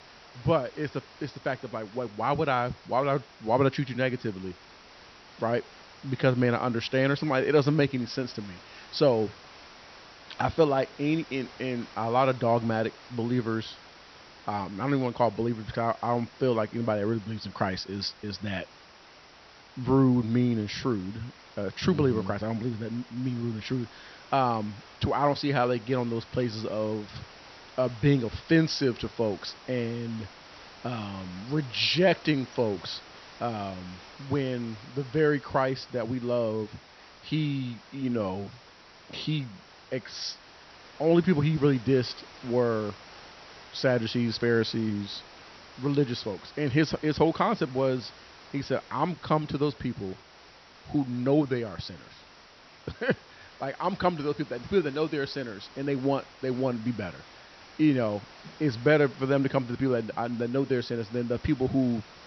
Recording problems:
high frequencies cut off; noticeable; nothing above 6 kHz
hiss; faint; throughout; 20 dB below the speech

